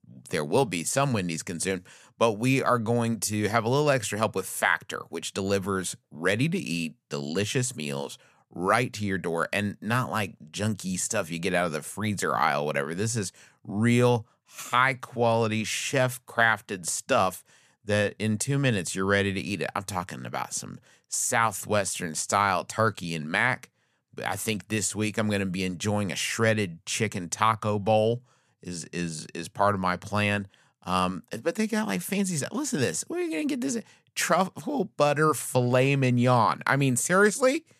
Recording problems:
none

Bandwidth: 14.5 kHz